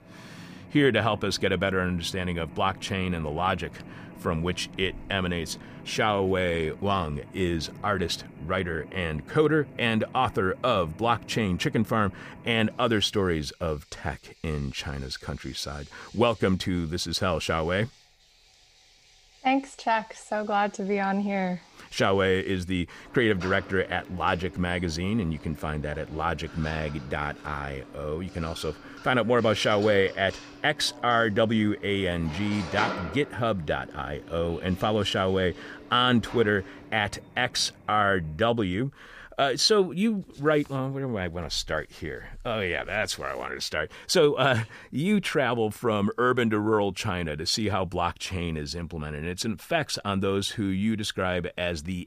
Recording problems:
machinery noise; noticeable; until 38 s; 15 dB below the speech

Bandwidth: 15 kHz